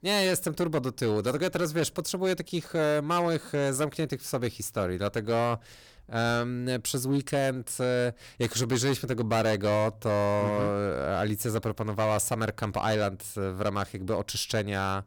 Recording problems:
distortion; slight; 8% of the sound clipped

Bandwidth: 18.5 kHz